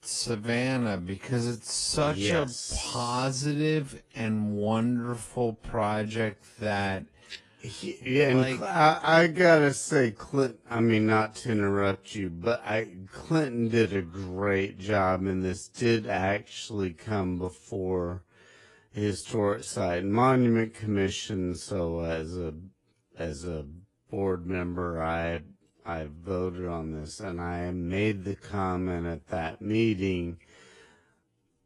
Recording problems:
wrong speed, natural pitch; too slow; 0.5 times normal speed
garbled, watery; slightly

